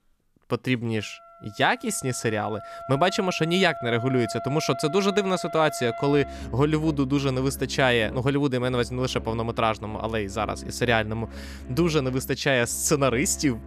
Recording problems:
background music; noticeable; throughout; 15 dB below the speech

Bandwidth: 14.5 kHz